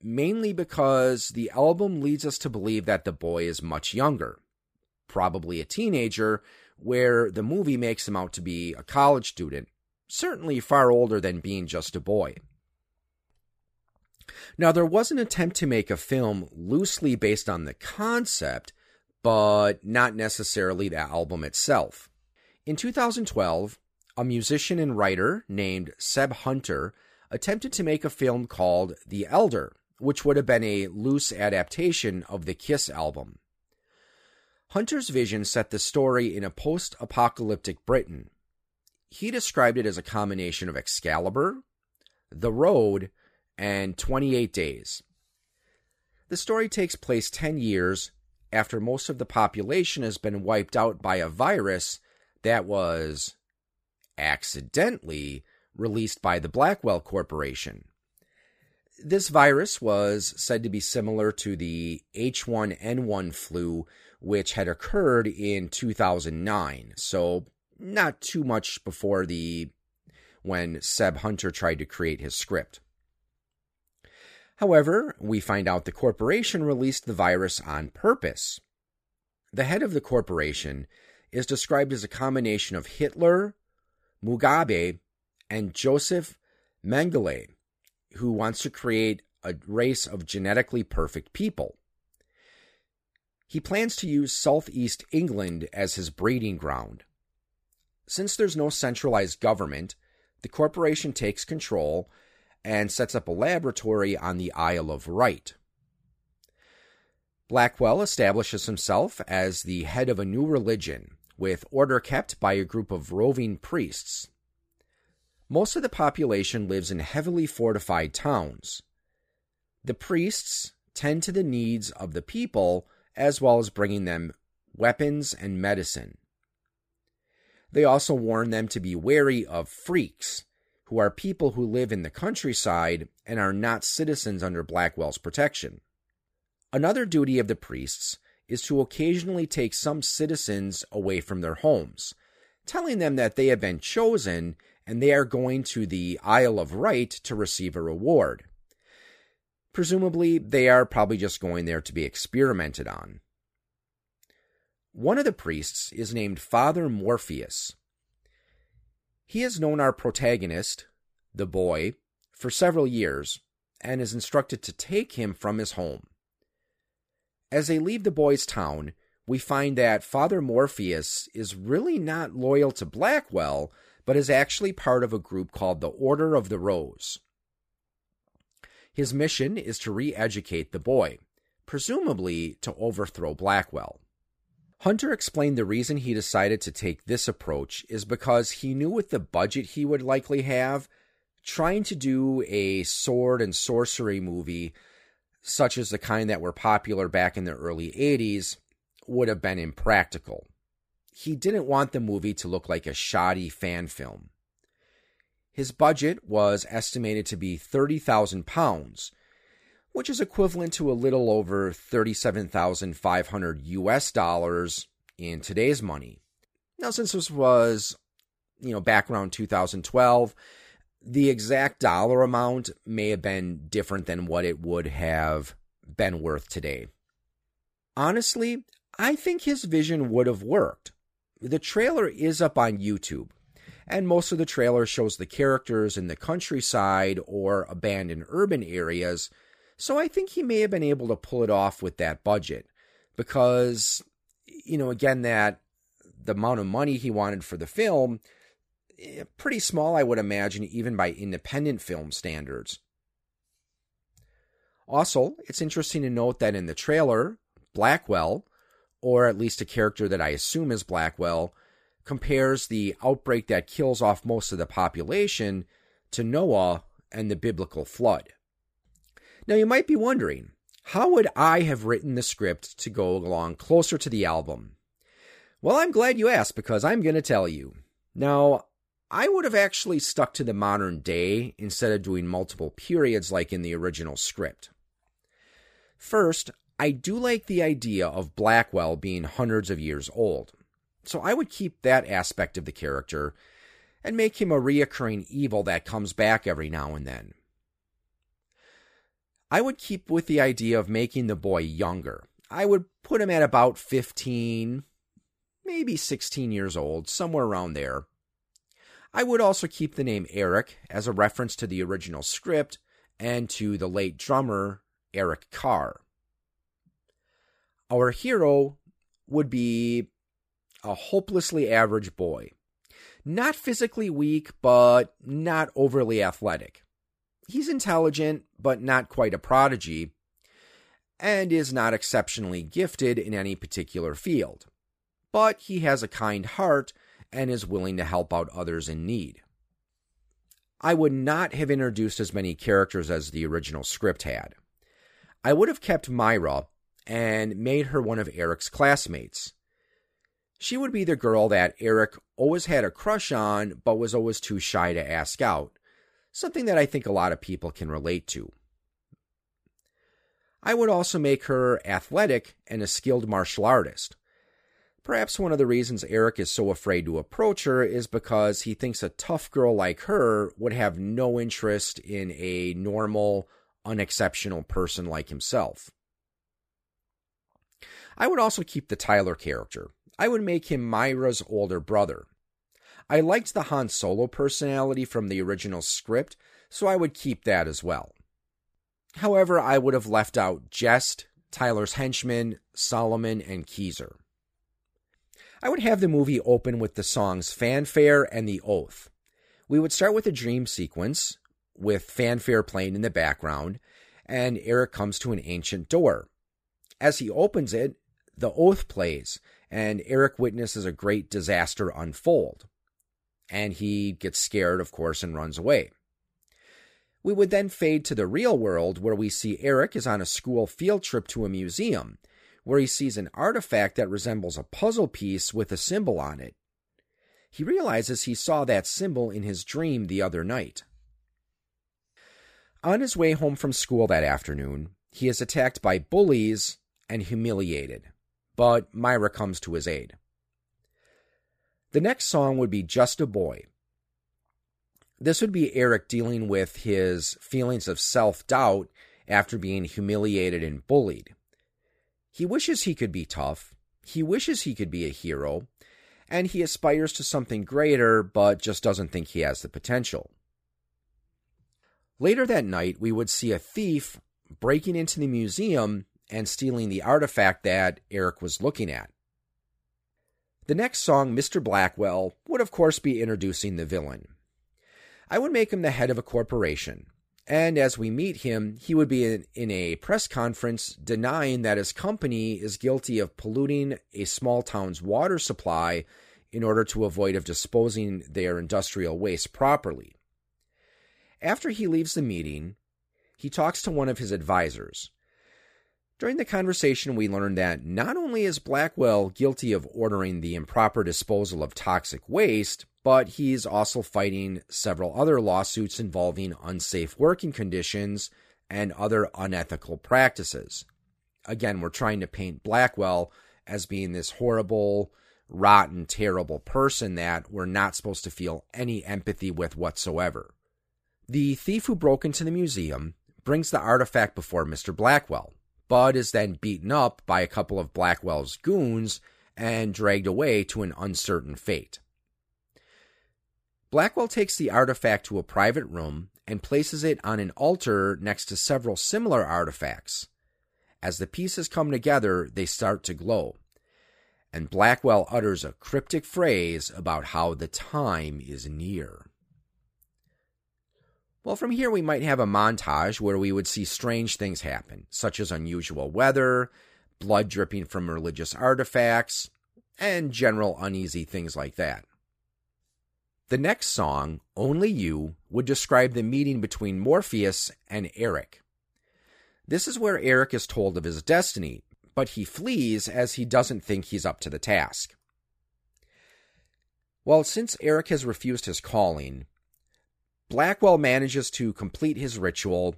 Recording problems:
none

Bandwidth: 15 kHz